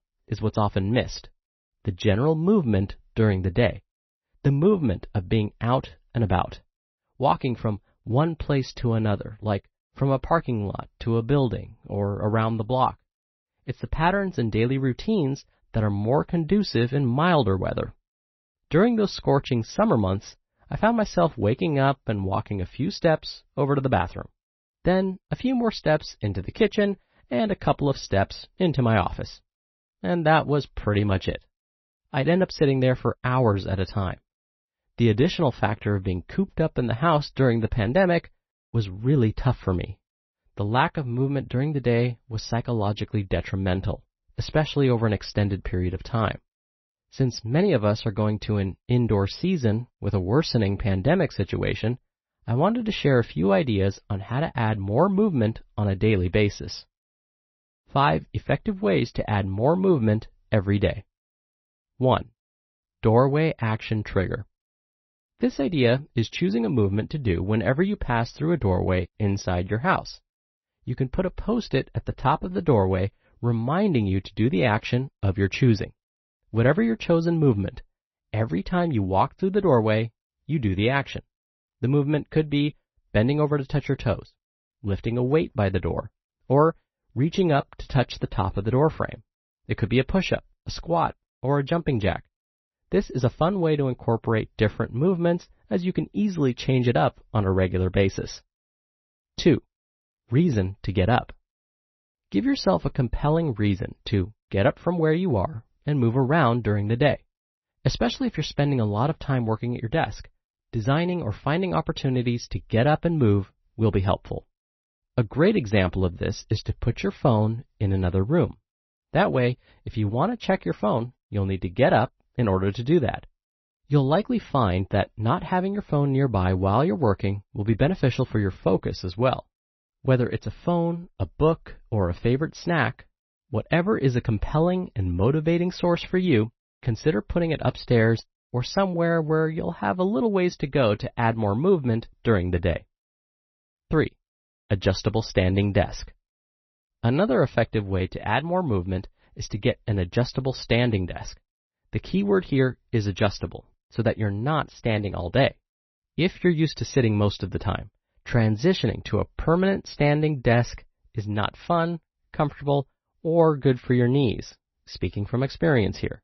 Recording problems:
garbled, watery; slightly; nothing above 6 kHz

